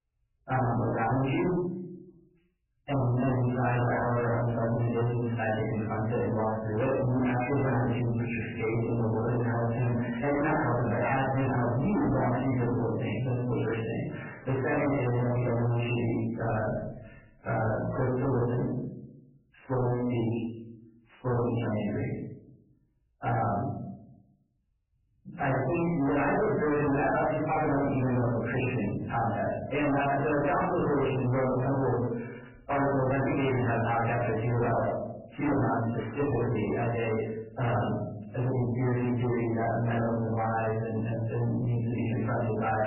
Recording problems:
distortion; heavy; 6 dB below the speech
off-mic speech; far
garbled, watery; badly; nothing above 3 kHz
room echo; noticeable; dies away in 0.7 s

